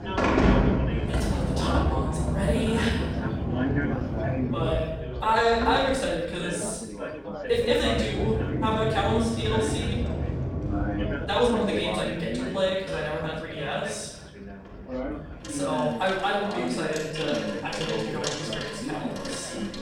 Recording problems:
off-mic speech; far
room echo; noticeable; dies away in 1 s
household noises; loud; throughout; 2 dB below the speech
background chatter; loud; throughout; 4 voices, 6 dB below the speech
uneven, jittery; strongly; from 1 to 19 s

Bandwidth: 17 kHz